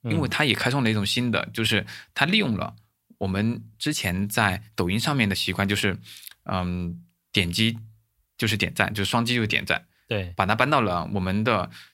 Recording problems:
none

